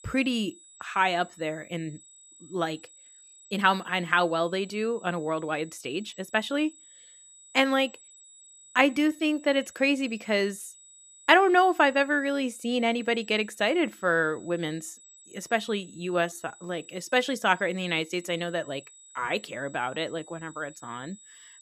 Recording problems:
high-pitched whine; faint; throughout; 8 kHz, 25 dB below the speech
uneven, jittery; strongly; from 1.5 to 17 s

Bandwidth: 14.5 kHz